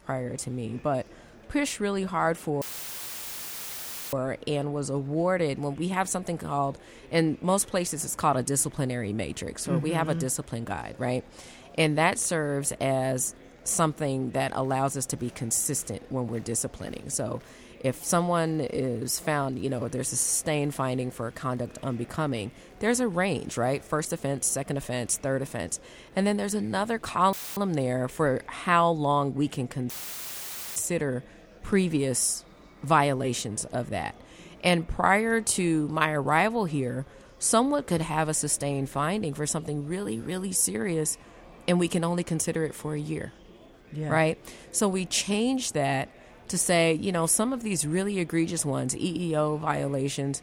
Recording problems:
murmuring crowd; faint; throughout; 25 dB below the speech
audio cutting out; filled with static; at 2.5 s for 1.5 s, at 27 s and at 30 s for 1 s

